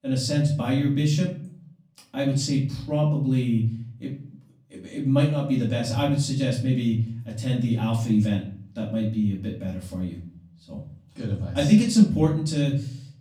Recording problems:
off-mic speech; far
room echo; slight; dies away in 0.5 s

